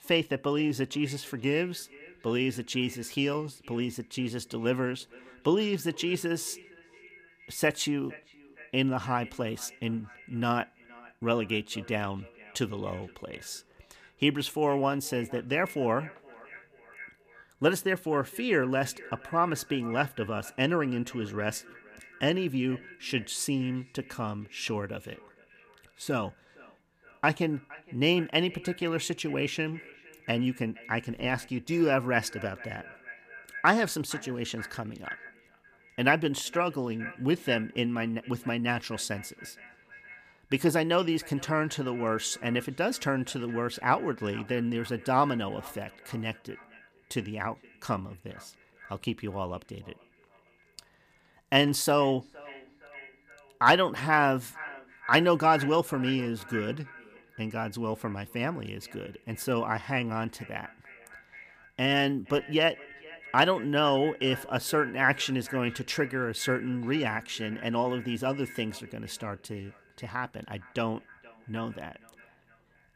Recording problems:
echo of what is said; noticeable; throughout; 460 ms later, 20 dB below the speech

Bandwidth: 15 kHz